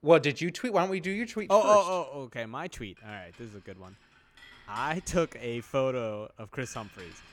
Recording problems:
household noises; faint; throughout; 25 dB below the speech

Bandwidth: 17 kHz